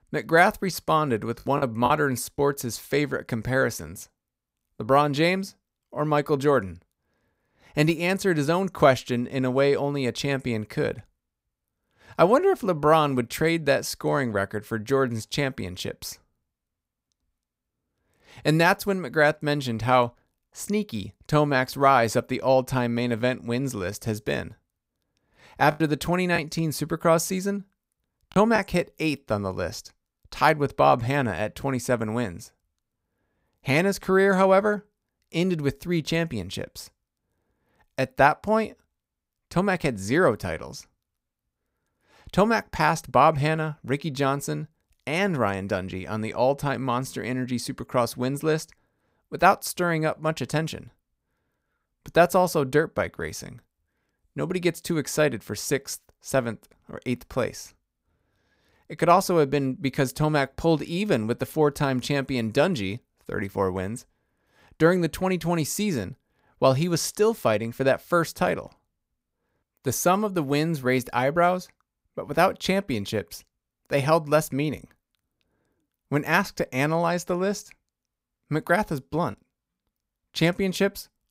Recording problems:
choppy; very; at 1.5 s and from 26 to 29 s; 6% of the speech affected

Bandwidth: 15.5 kHz